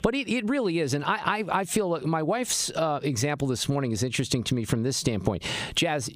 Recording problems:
squashed, flat; heavily

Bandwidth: 15 kHz